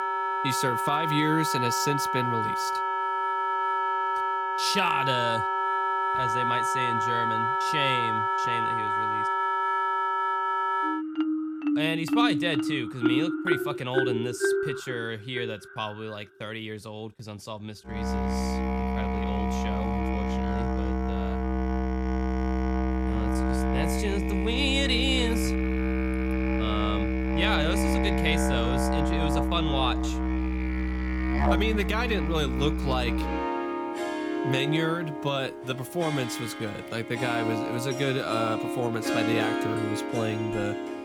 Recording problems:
background music; very loud; throughout; 3 dB above the speech

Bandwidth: 17.5 kHz